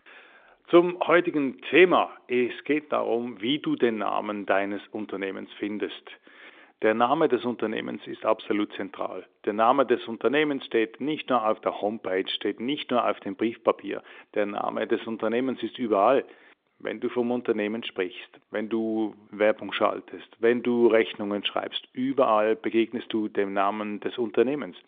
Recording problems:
phone-call audio; nothing above 3 kHz

